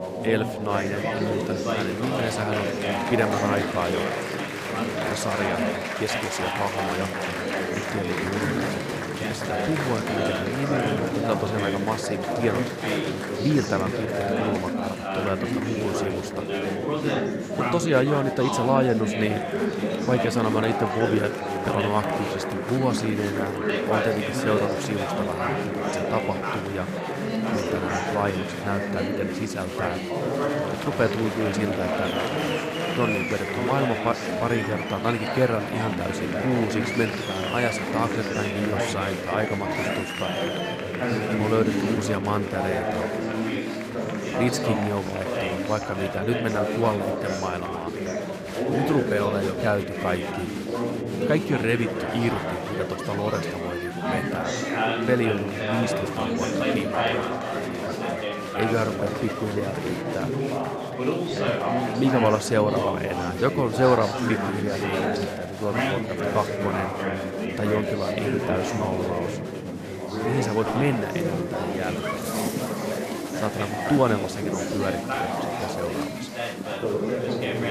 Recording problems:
chatter from many people; very loud; throughout; as loud as the speech

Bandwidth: 14.5 kHz